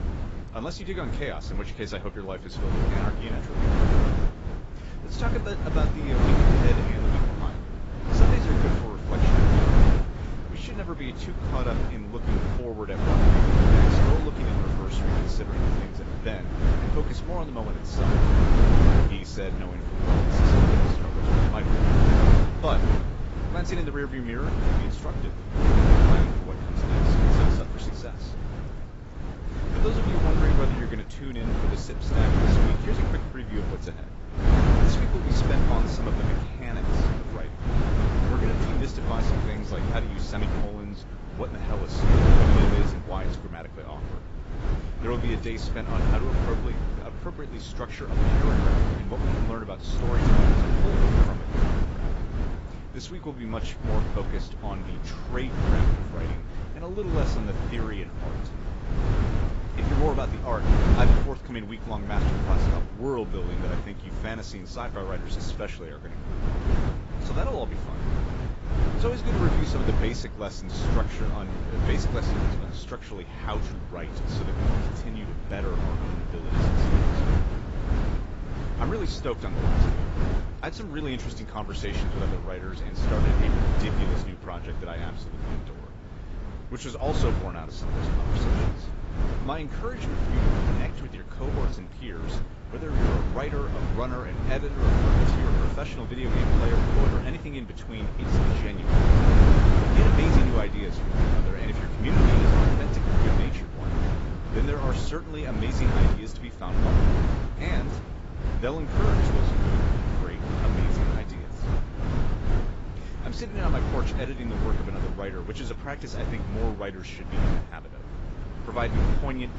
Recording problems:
garbled, watery; badly; nothing above 7.5 kHz
wind noise on the microphone; heavy; 3 dB above the speech
rain or running water; faint; throughout; 25 dB below the speech

